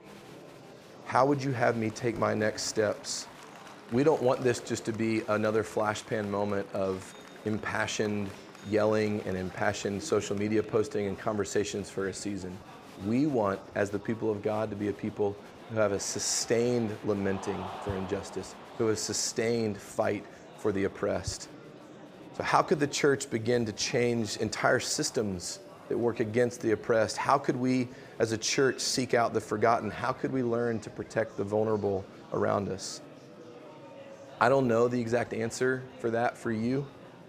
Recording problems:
murmuring crowd; noticeable; throughout; 20 dB below the speech

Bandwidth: 15 kHz